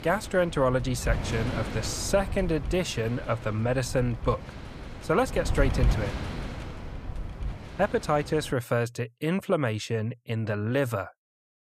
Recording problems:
wind noise on the microphone; occasional gusts; until 8.5 s; 10 dB below the speech

